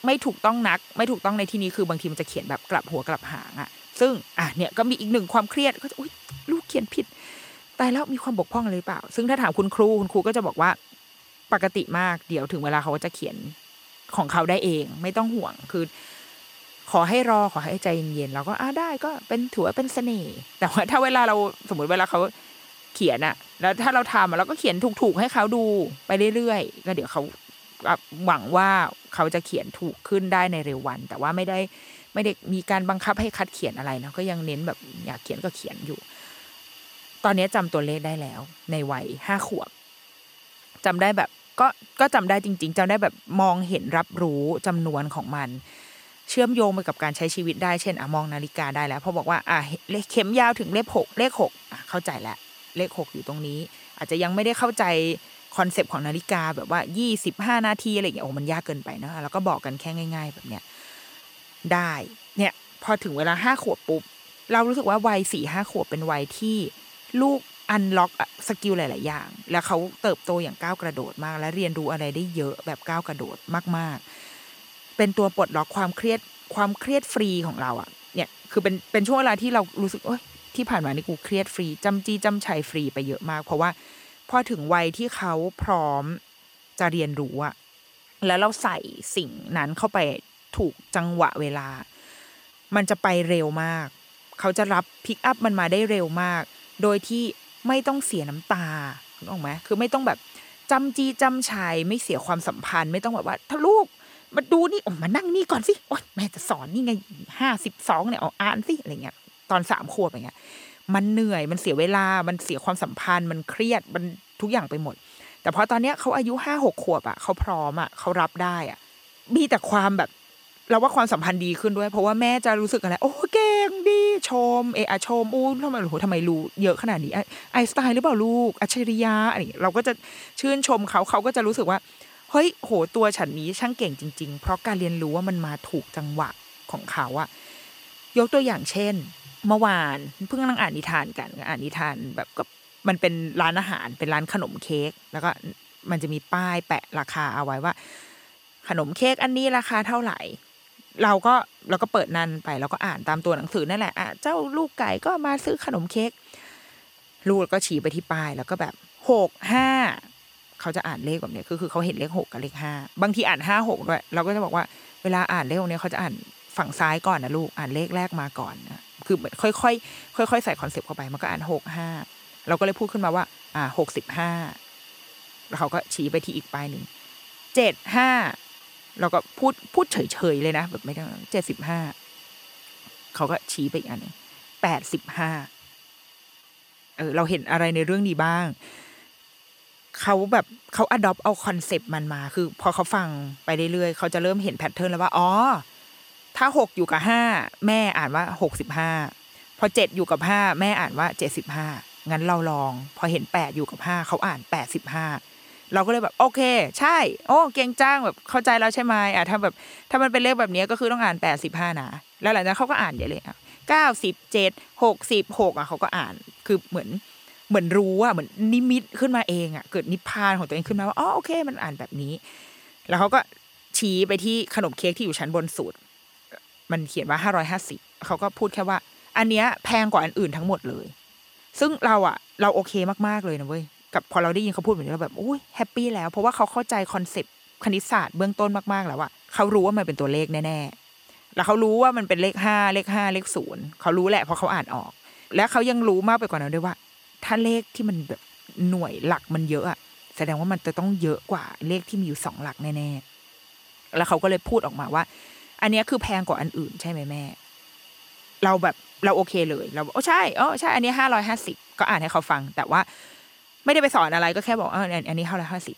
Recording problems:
hiss; faint; throughout; 25 dB below the speech

